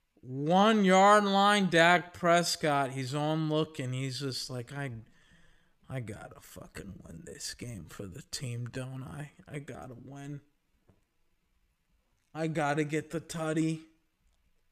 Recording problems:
wrong speed, natural pitch; too slow; 0.6 times normal speed

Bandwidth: 14.5 kHz